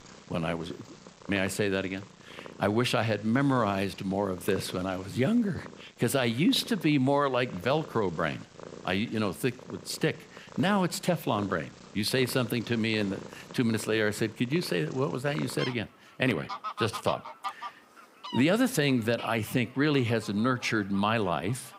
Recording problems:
animal sounds; noticeable; throughout; 15 dB below the speech

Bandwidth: 15.5 kHz